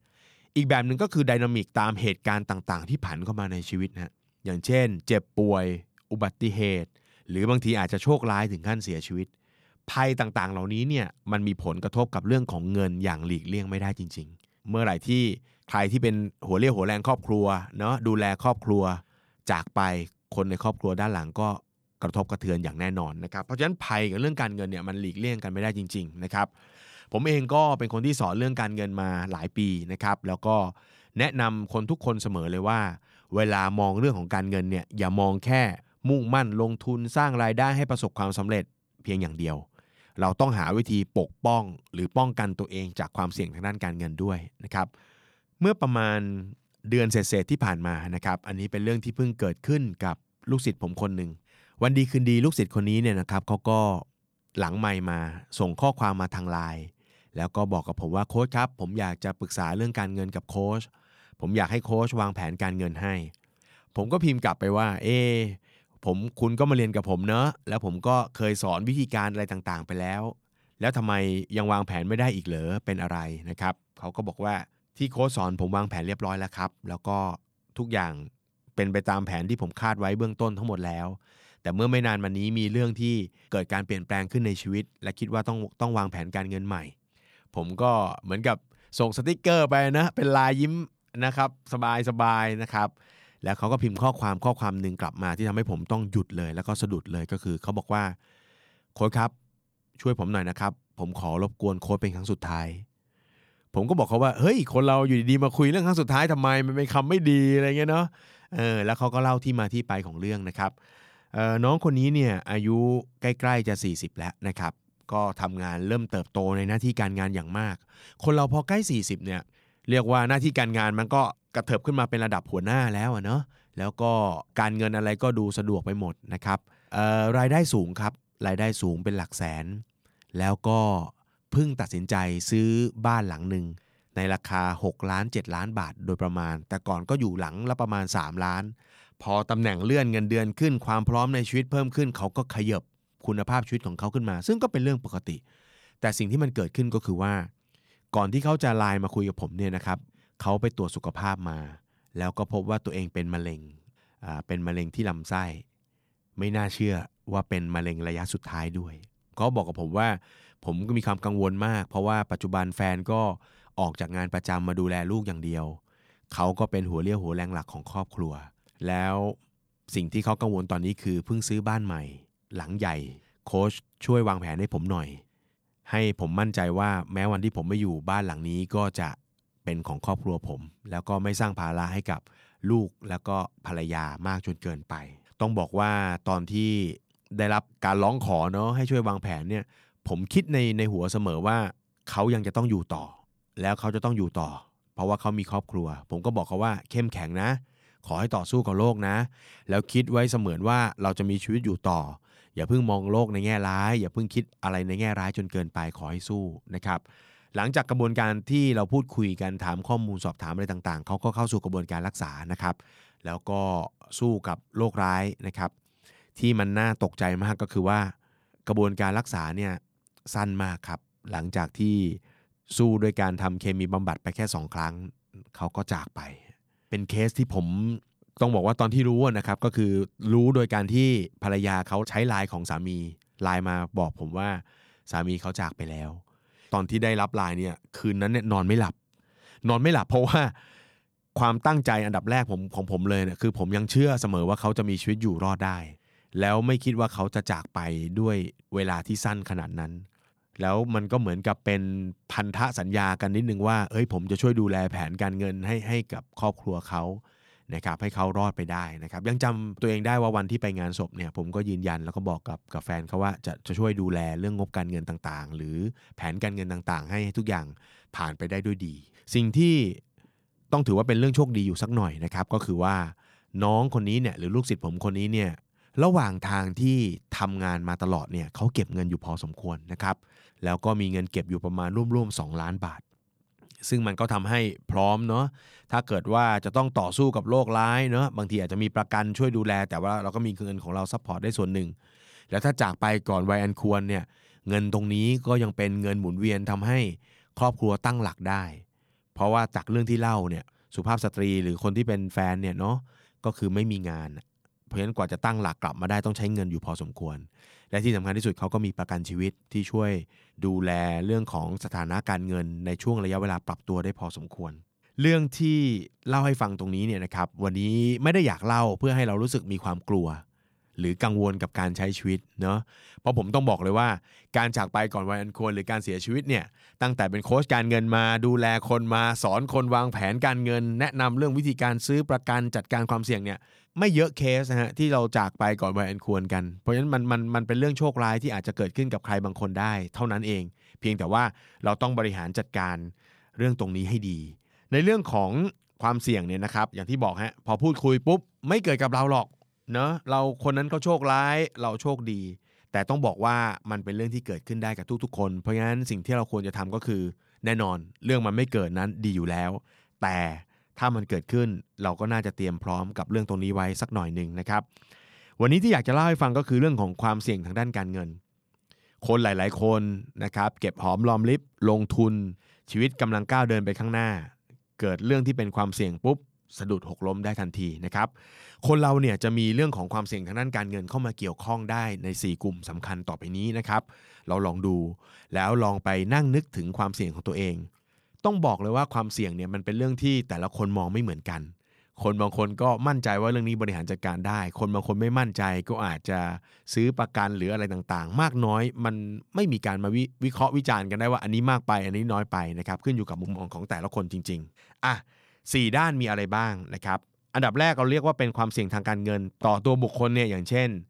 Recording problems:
none

